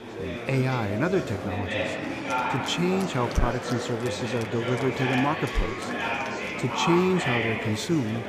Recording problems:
murmuring crowd; loud; throughout; 2 dB below the speech

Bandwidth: 14.5 kHz